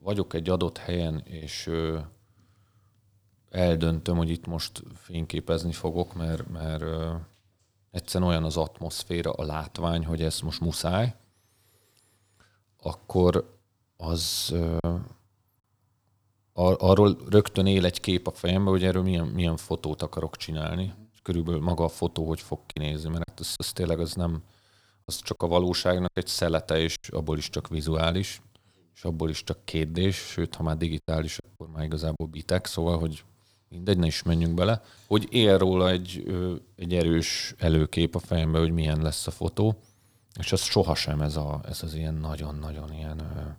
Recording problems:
choppy; very; at 15 s, from 23 to 27 s and at 31 s; 6% of the speech affected

